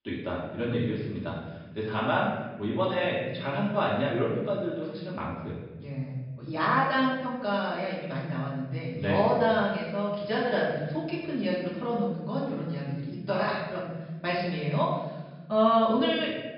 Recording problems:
off-mic speech; far
room echo; noticeable; dies away in 1.3 s
high frequencies cut off; noticeable; nothing above 5.5 kHz

